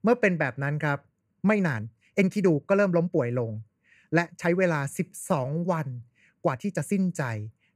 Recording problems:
uneven, jittery; strongly; from 1 to 7 s

